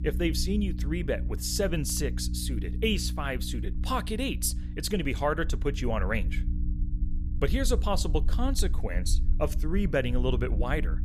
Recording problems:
electrical hum; noticeable; throughout; 60 Hz, 15 dB below the speech
low rumble; faint; throughout; 25 dB below the speech

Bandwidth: 14.5 kHz